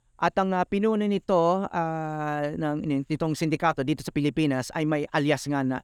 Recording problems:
none

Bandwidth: 18.5 kHz